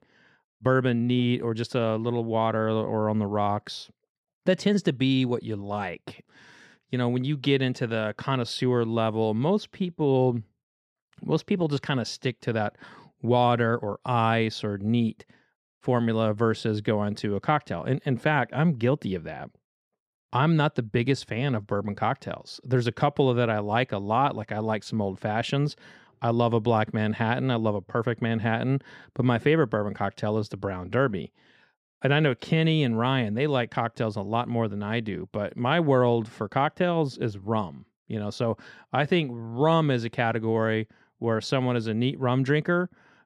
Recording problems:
none

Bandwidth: 13.5 kHz